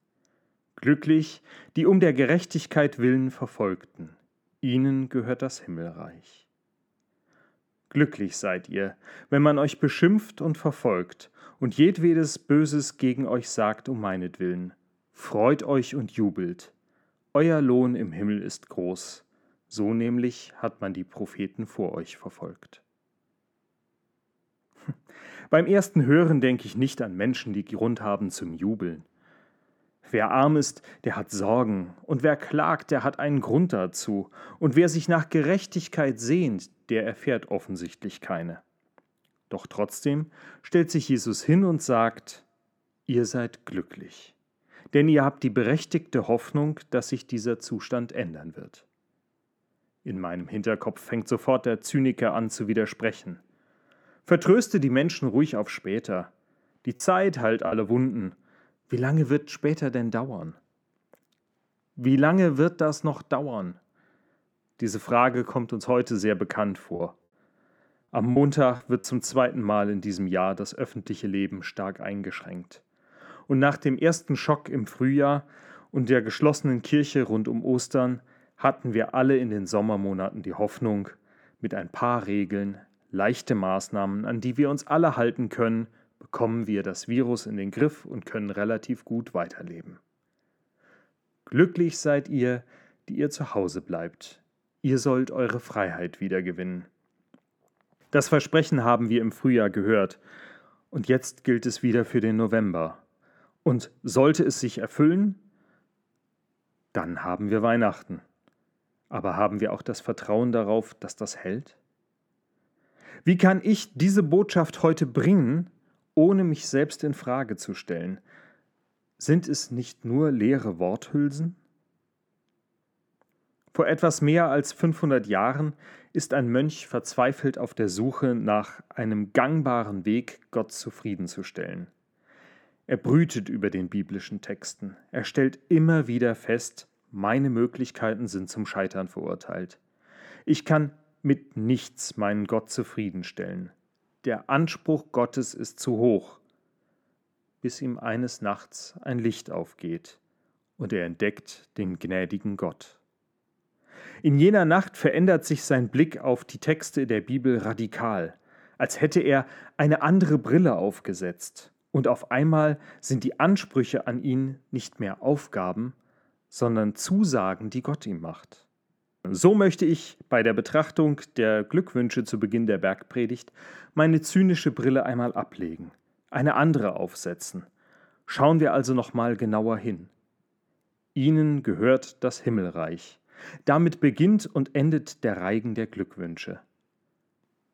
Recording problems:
muffled; slightly; fading above 2.5 kHz
choppy; very; at 57 s and from 1:07 to 1:09; 10% of the speech affected

